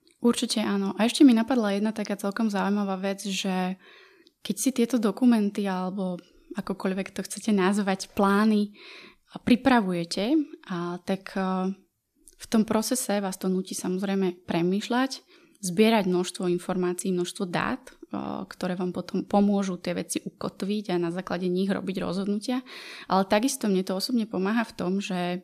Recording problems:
none

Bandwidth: 14.5 kHz